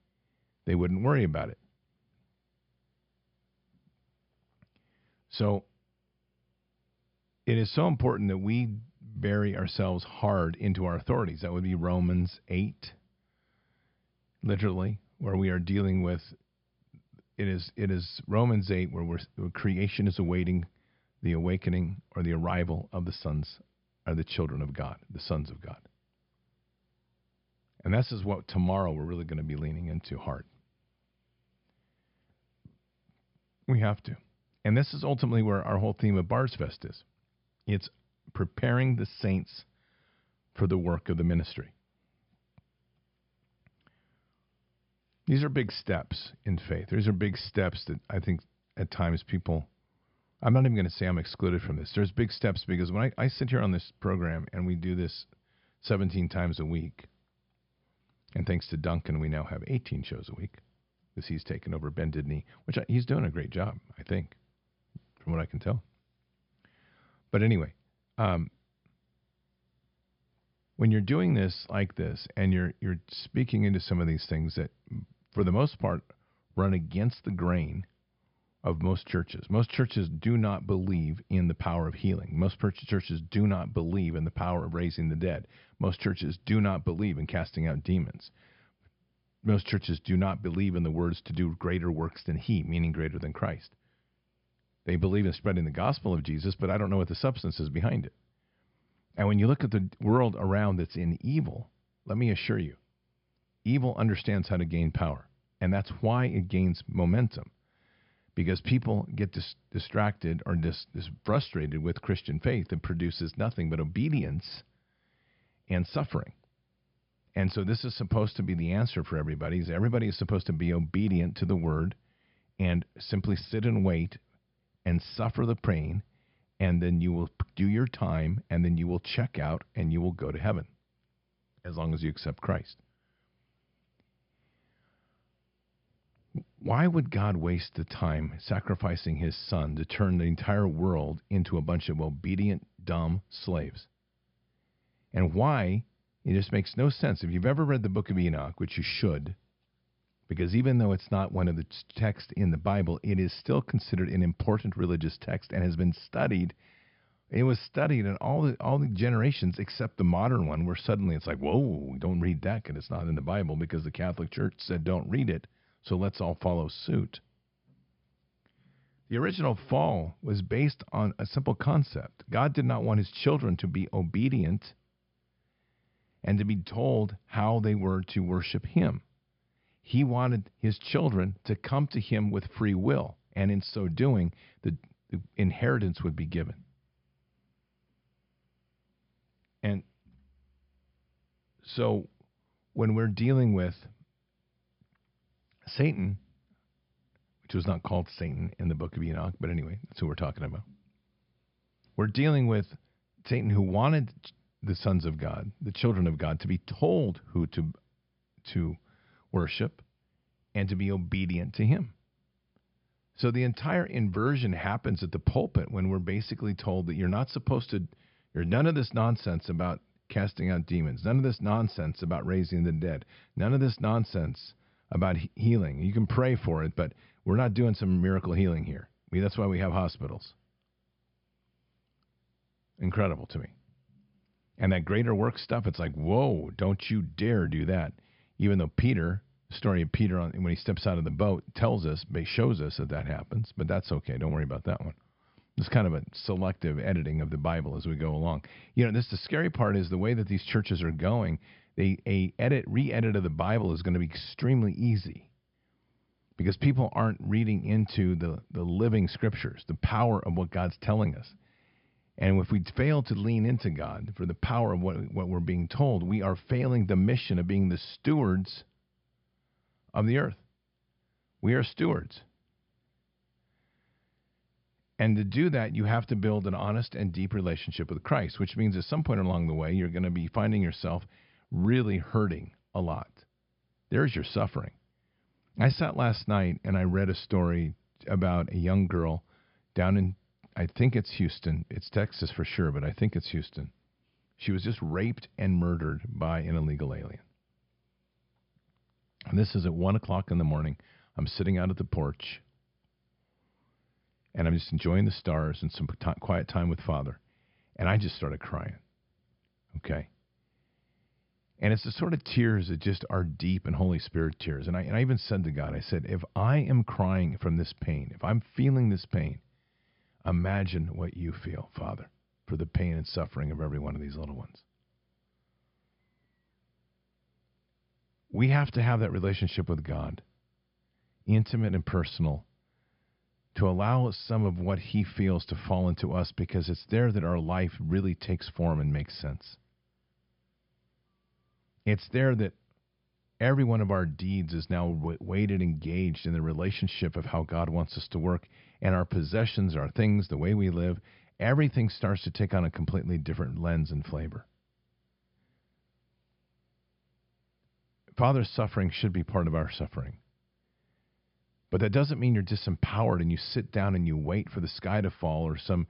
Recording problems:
high frequencies cut off; noticeable; nothing above 5 kHz

